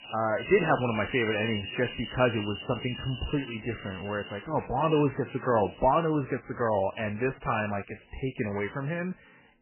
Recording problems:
garbled, watery; badly; nothing above 3 kHz
animal sounds; noticeable; until 5.5 s; 10 dB below the speech

